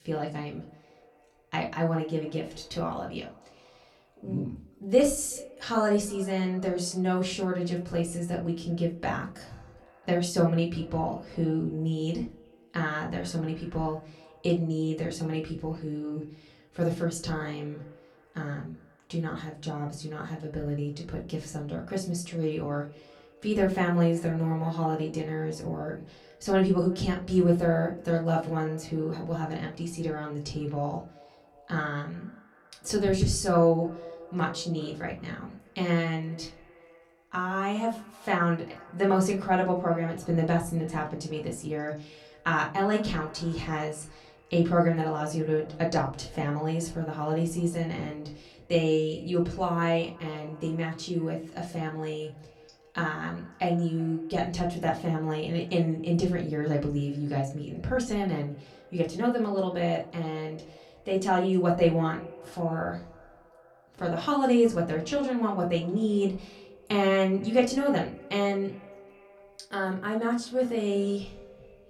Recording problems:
off-mic speech; far
echo of what is said; faint; throughout; 380 ms later, 25 dB below the speech
room echo; very slight; dies away in 0.3 s

